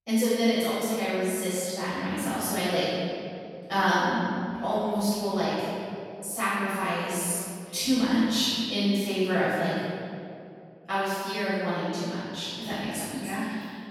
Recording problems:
room echo; strong; dies away in 2.4 s
off-mic speech; far

